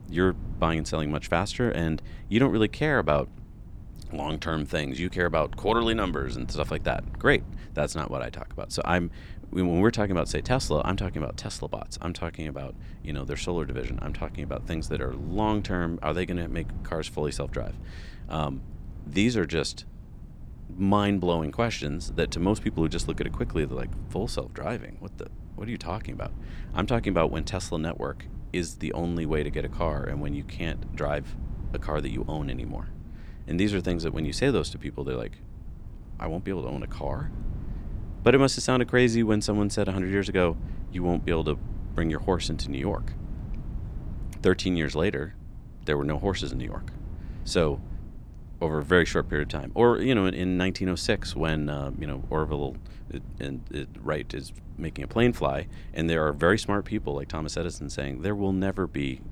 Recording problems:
wind noise on the microphone; occasional gusts; 25 dB below the speech

